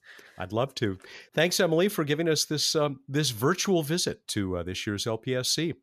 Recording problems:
none

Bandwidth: 14.5 kHz